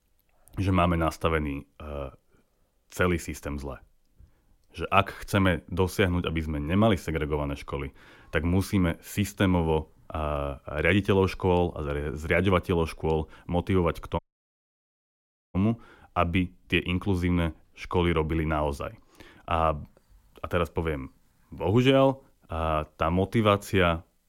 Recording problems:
audio cutting out; at 14 s for 1.5 s

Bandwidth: 16.5 kHz